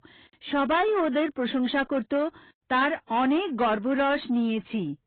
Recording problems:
garbled, watery; badly
high frequencies cut off; severe; nothing above 4 kHz
distortion; slight; 10 dB below the speech

